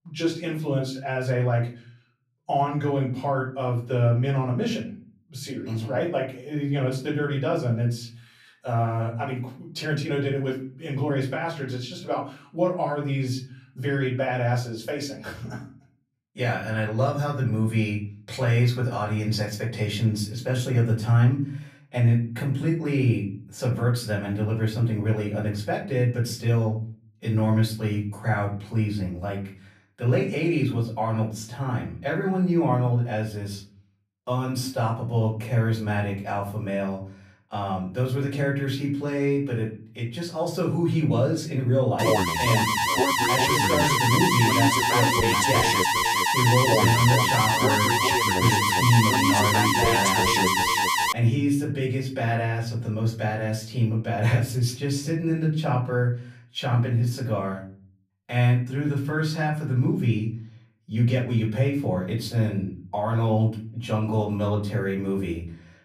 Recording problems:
off-mic speech; far
room echo; slight; dies away in 0.4 s
alarm; loud; from 42 to 51 s; peak 6 dB above the speech

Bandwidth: 15 kHz